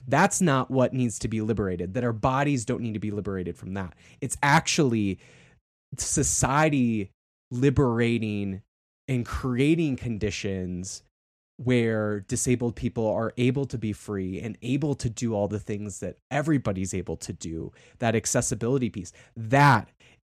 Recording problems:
none

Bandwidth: 14 kHz